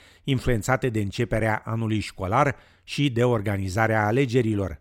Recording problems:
none

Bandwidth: 16.5 kHz